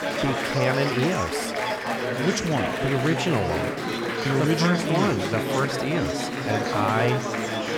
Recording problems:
chatter from many people; loud; throughout; as loud as the speech

